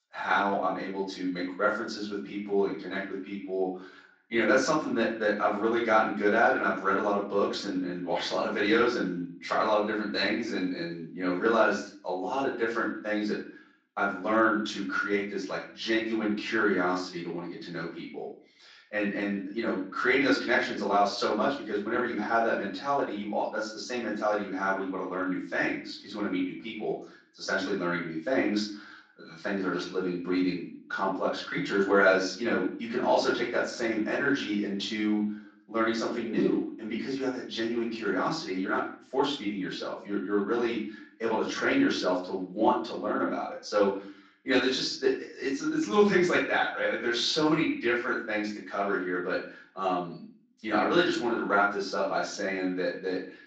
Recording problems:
off-mic speech; far
room echo; noticeable; dies away in 0.4 s
garbled, watery; slightly
thin; very slightly; fading below 300 Hz

